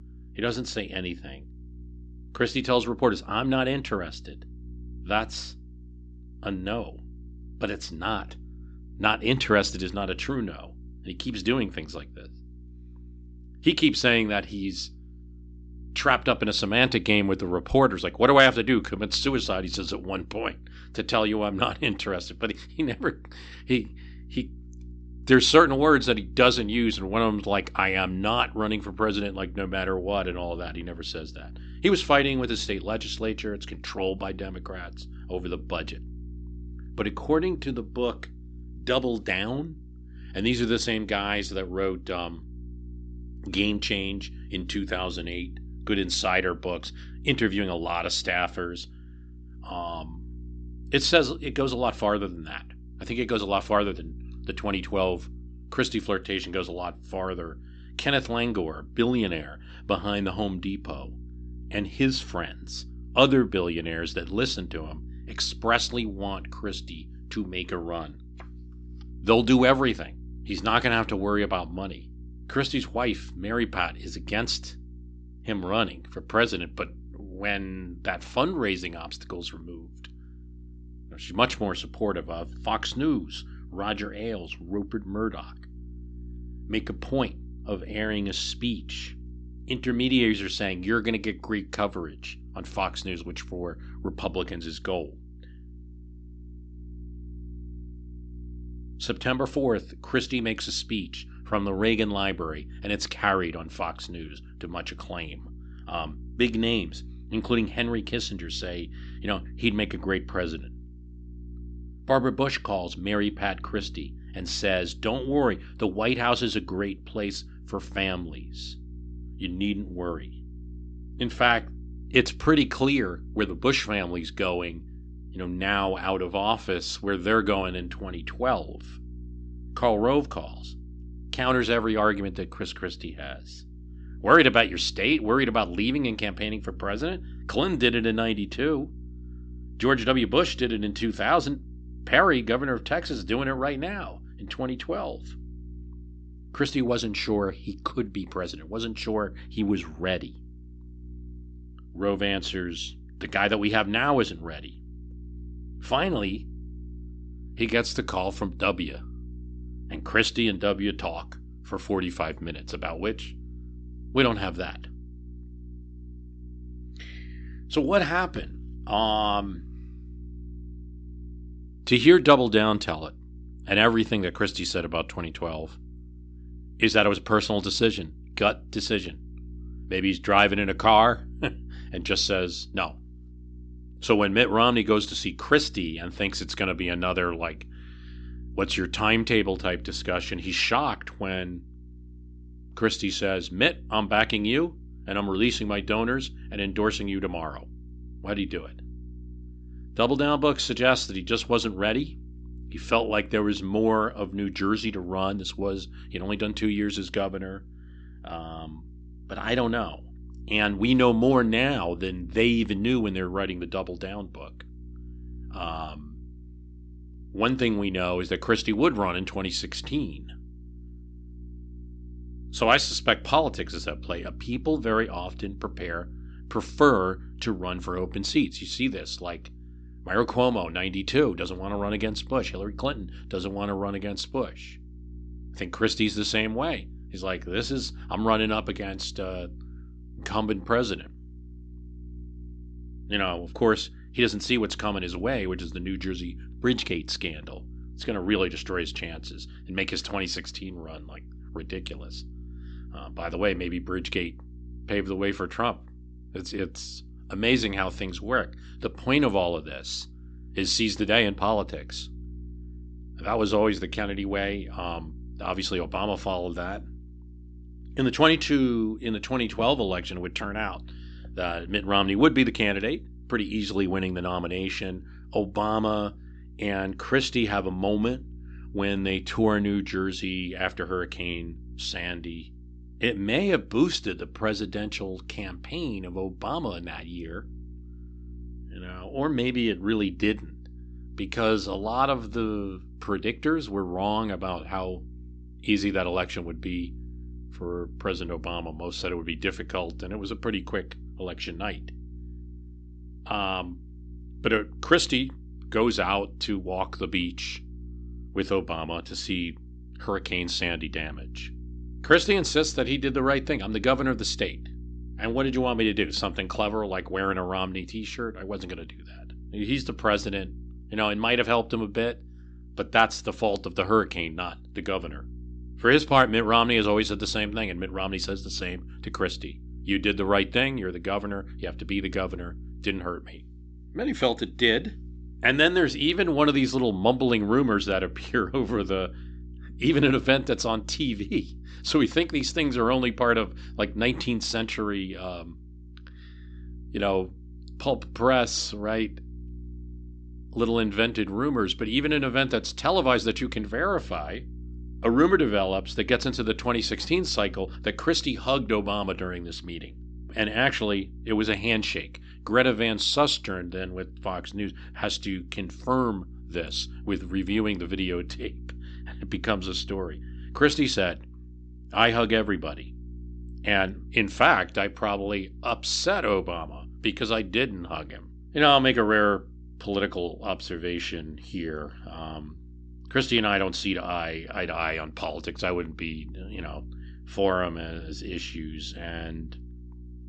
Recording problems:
high frequencies cut off; noticeable; nothing above 8 kHz
electrical hum; faint; throughout; 60 Hz, 30 dB below the speech

